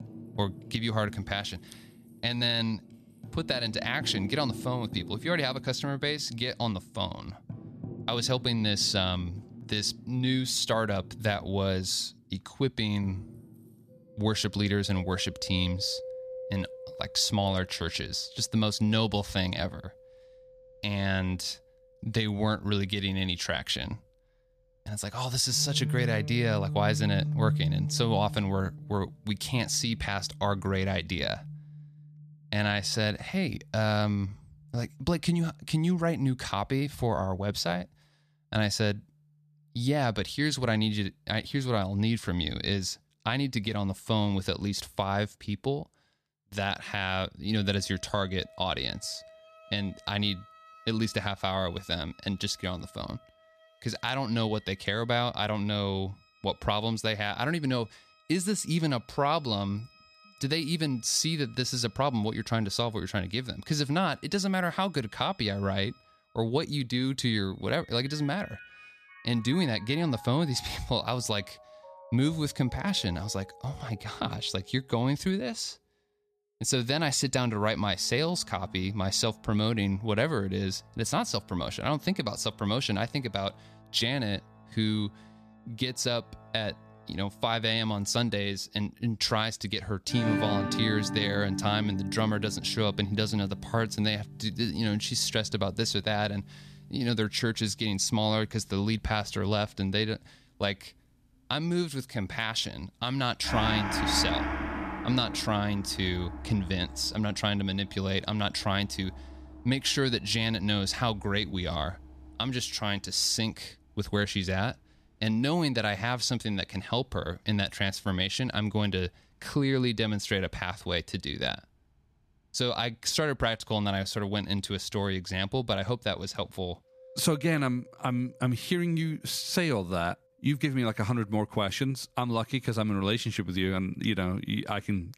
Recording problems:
background music; noticeable; throughout; 10 dB below the speech

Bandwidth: 14.5 kHz